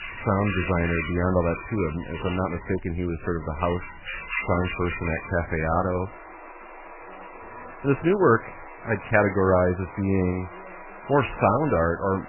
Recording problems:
garbled, watery; badly; nothing above 3 kHz
animal sounds; noticeable; throughout; 10 dB below the speech

